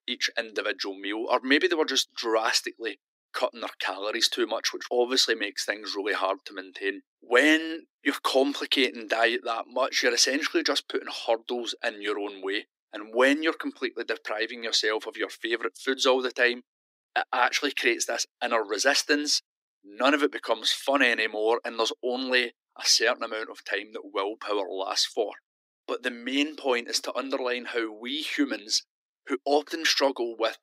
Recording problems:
thin; somewhat; fading below 300 Hz

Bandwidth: 15.5 kHz